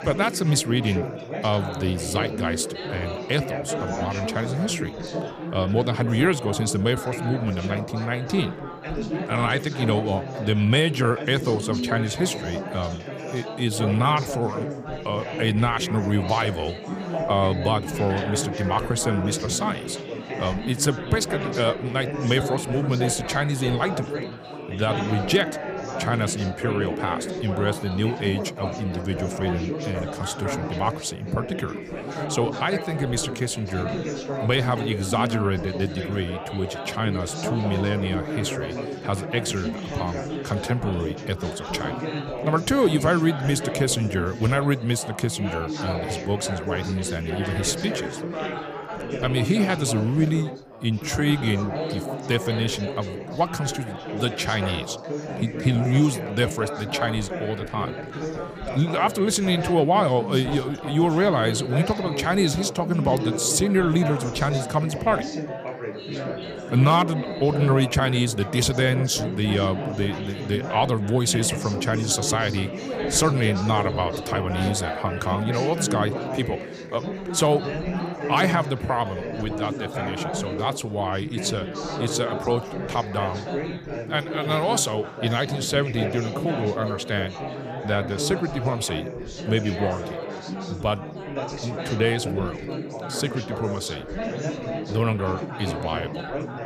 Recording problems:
chatter from many people; loud; throughout; 6 dB below the speech

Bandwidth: 15 kHz